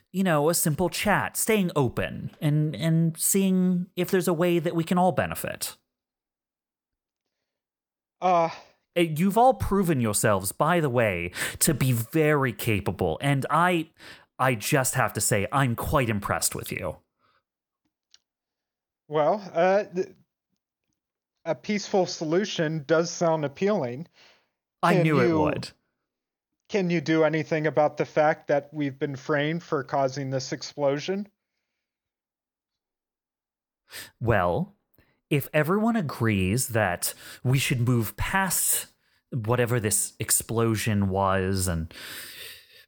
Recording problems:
none

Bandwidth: 19 kHz